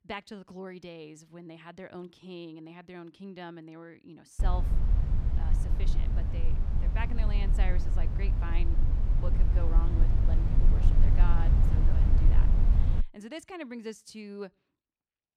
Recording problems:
low rumble; loud; from 4.5 to 13 s; 1 dB below the speech

